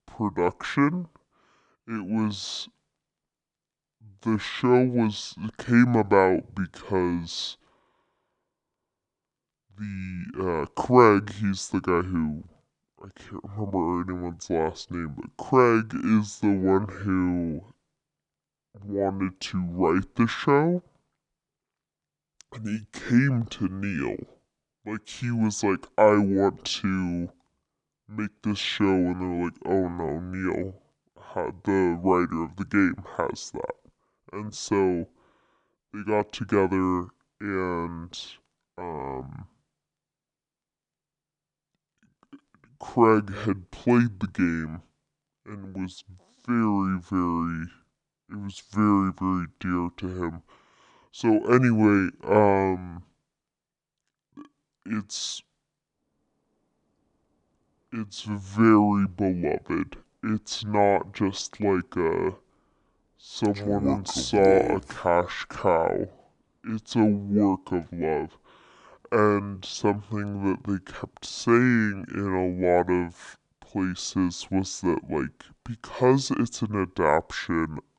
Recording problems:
wrong speed and pitch; too slow and too low; 0.6 times normal speed

